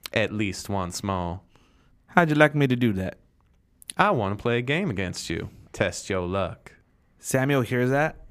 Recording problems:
none

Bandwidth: 15 kHz